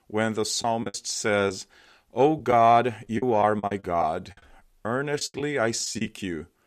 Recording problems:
choppy; very; at 0.5 s and from 2.5 to 6 s; 11% of the speech affected

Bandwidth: 14.5 kHz